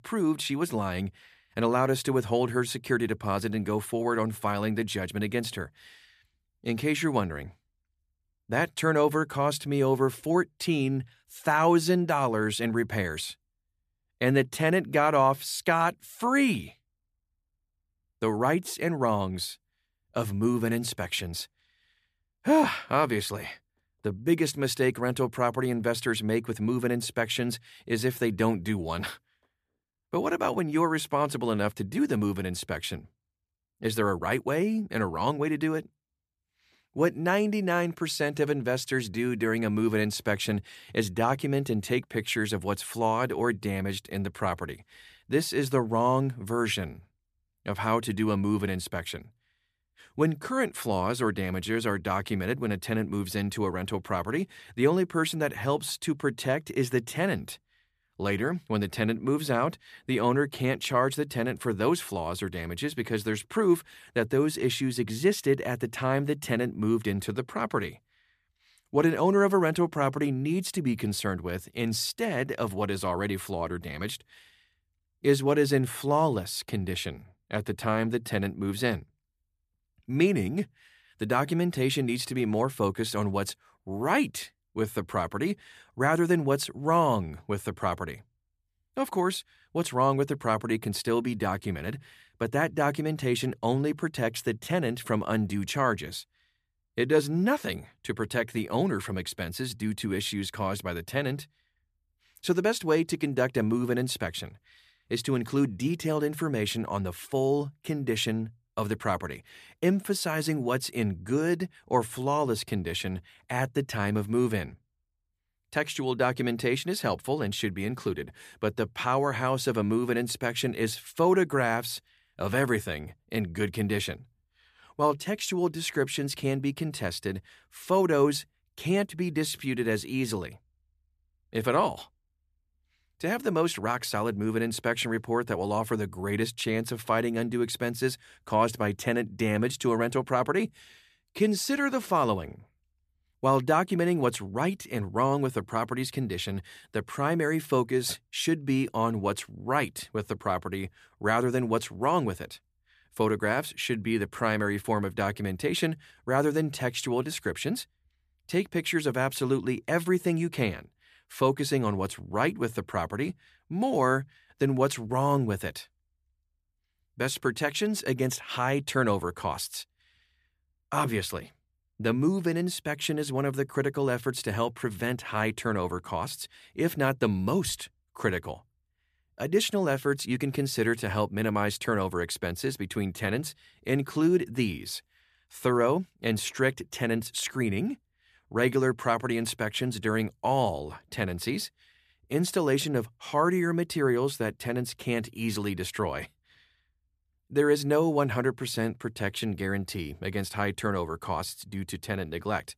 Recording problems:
none

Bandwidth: 14.5 kHz